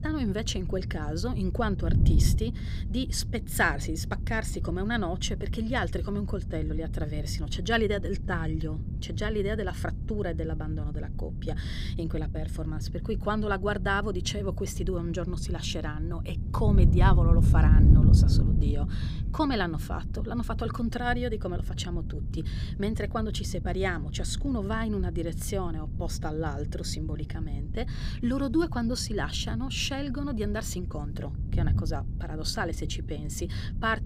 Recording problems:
wind noise on the microphone; occasional gusts; 10 dB below the speech

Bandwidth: 15.5 kHz